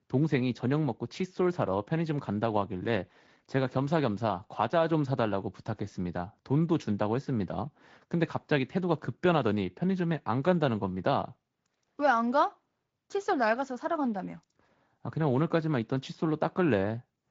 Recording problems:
garbled, watery; slightly; nothing above 7.5 kHz

